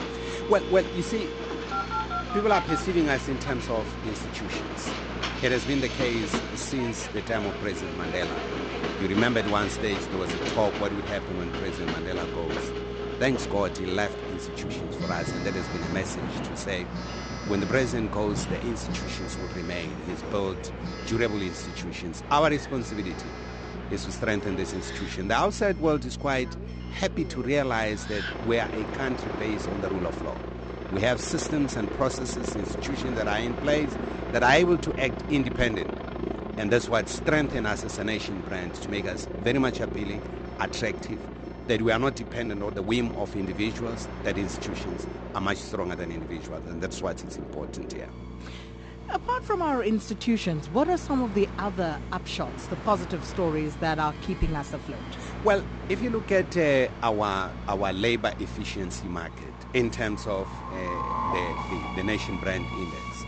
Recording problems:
high frequencies cut off; noticeable; nothing above 8 kHz
train or aircraft noise; loud; throughout; 8 dB below the speech
alarms or sirens; noticeable; throughout; 10 dB below the speech
electrical hum; faint; throughout; 60 Hz, 20 dB below the speech

